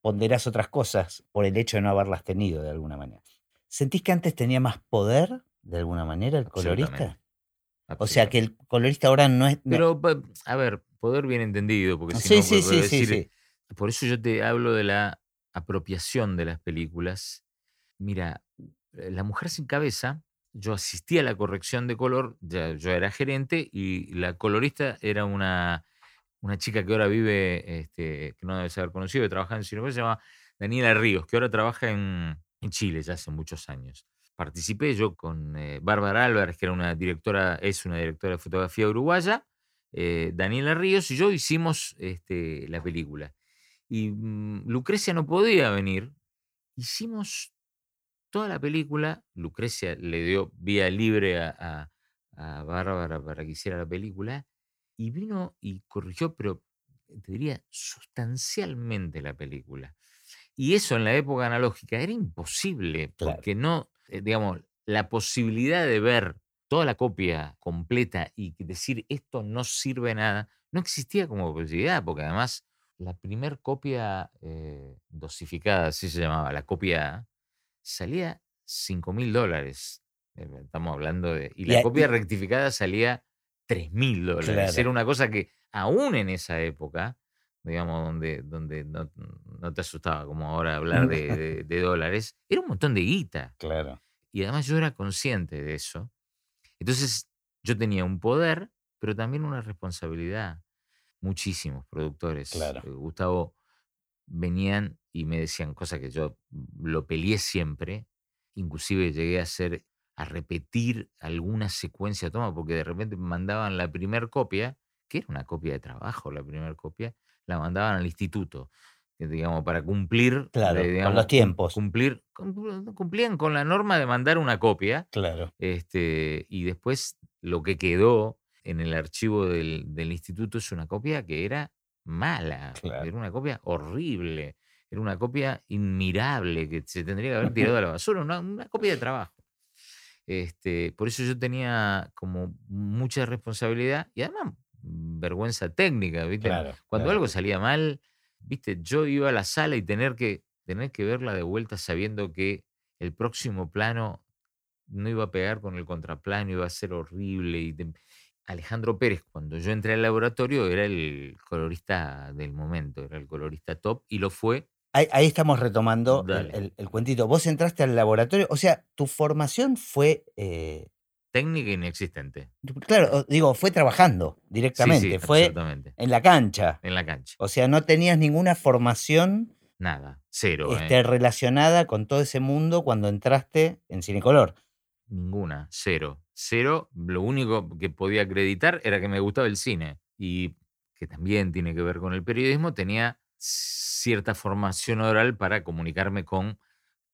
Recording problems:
uneven, jittery; strongly; from 45 s to 3:15

